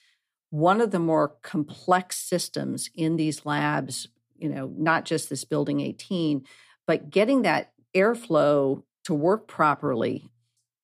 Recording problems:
none

